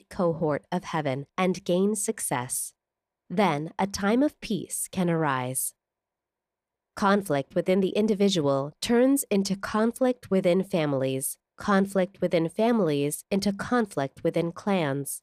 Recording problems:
none

